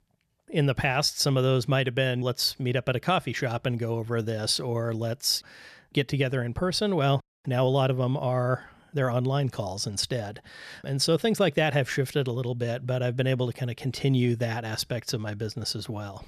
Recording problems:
none

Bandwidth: 14 kHz